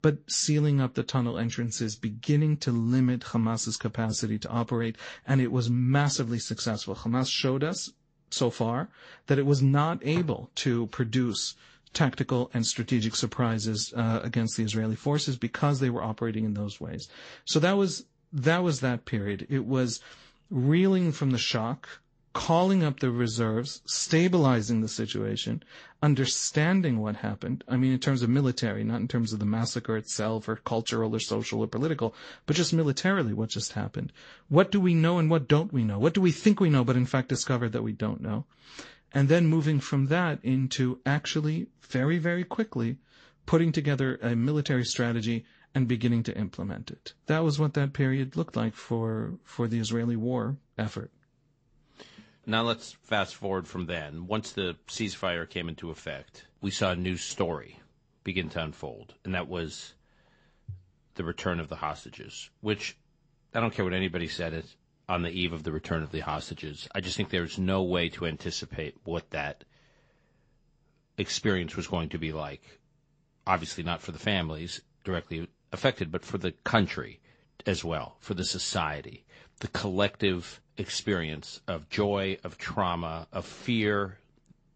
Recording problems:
high frequencies cut off; noticeable; nothing above 8 kHz
garbled, watery; slightly

